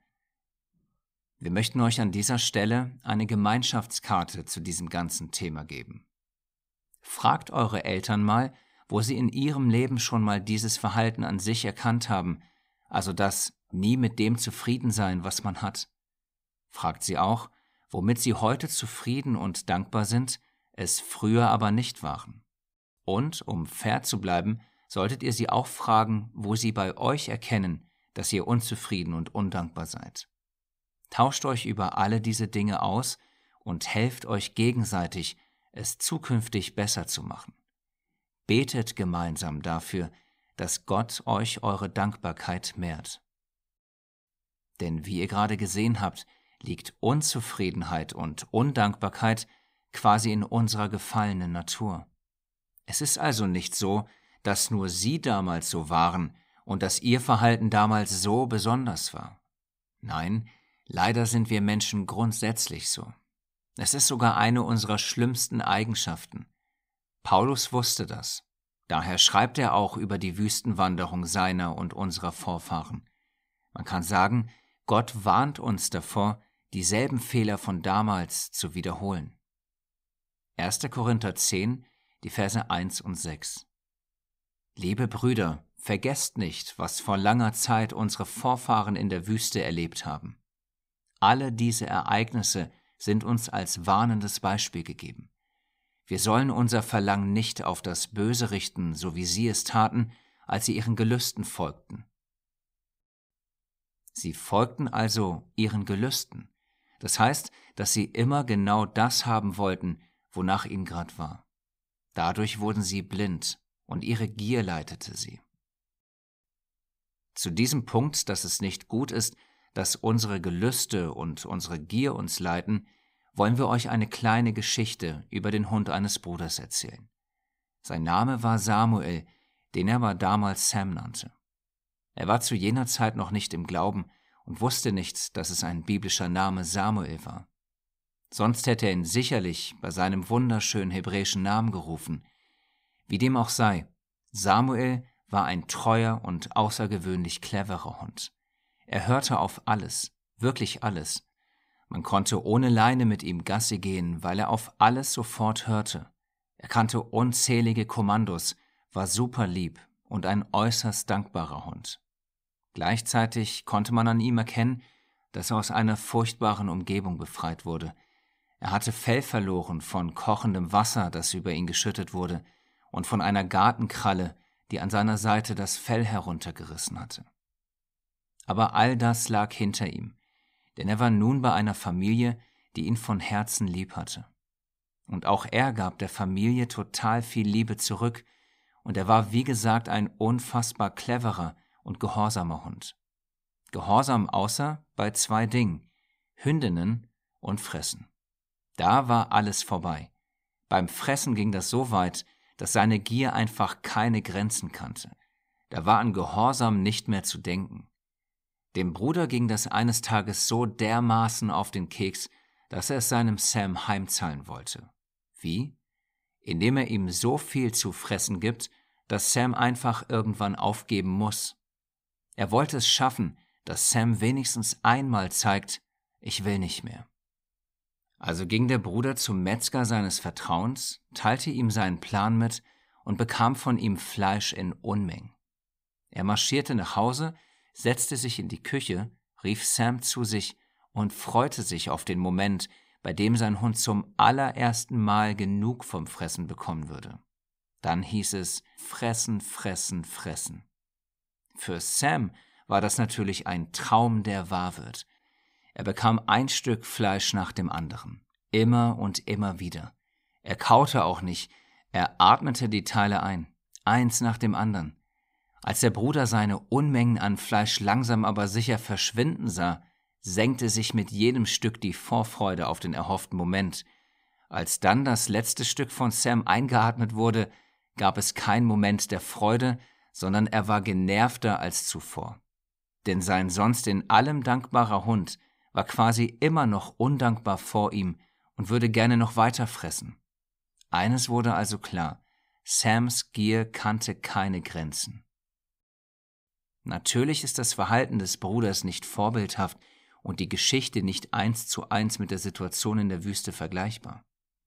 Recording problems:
none

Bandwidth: 15.5 kHz